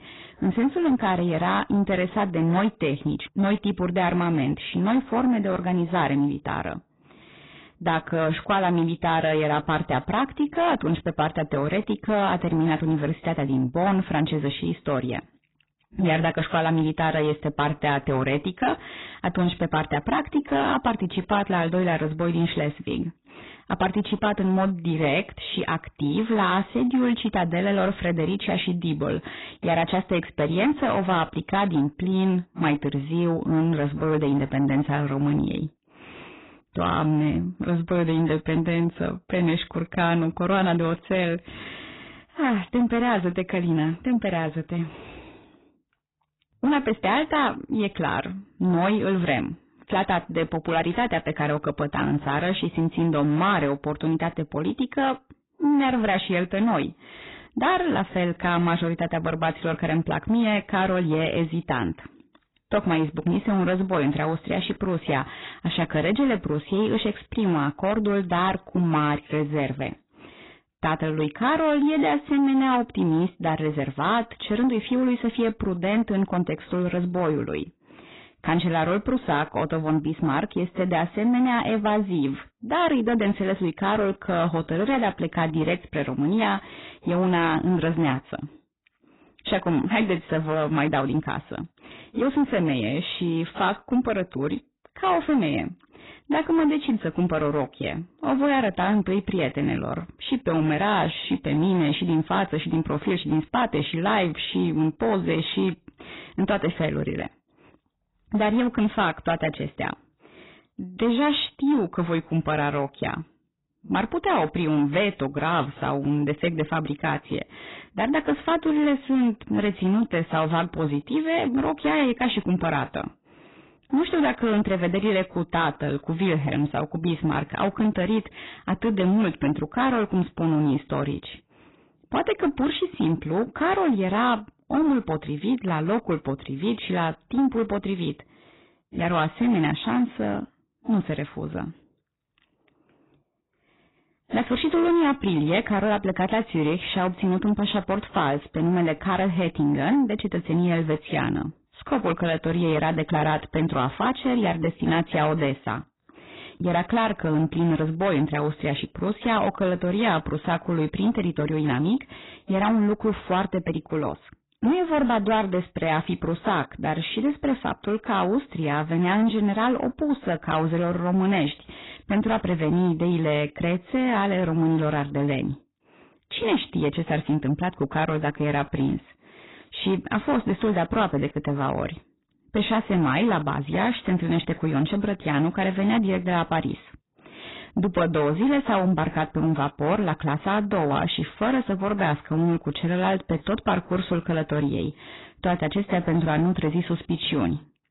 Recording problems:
garbled, watery; badly; nothing above 4 kHz
distortion; slight; 10 dB below the speech

